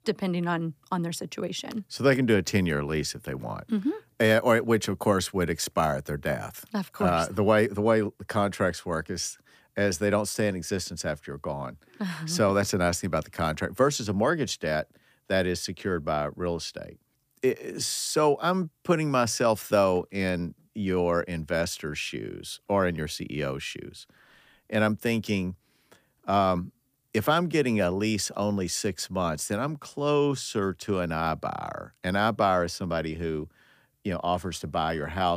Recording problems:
abrupt cut into speech; at the end

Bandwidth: 15 kHz